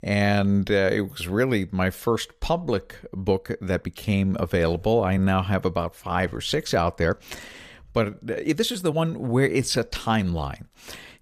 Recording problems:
uneven, jittery; strongly; from 1.5 to 10 s

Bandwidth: 14.5 kHz